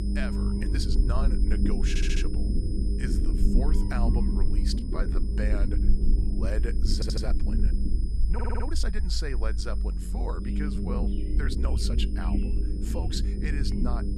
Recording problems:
low rumble; loud; throughout; 3 dB below the speech
high-pitched whine; noticeable; throughout; 5 kHz, 15 dB below the speech
animal sounds; faint; throughout; 25 dB below the speech
uneven, jittery; strongly; from 0.5 to 13 s
audio stuttering; at 2 s, at 7 s and at 8.5 s

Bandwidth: 14 kHz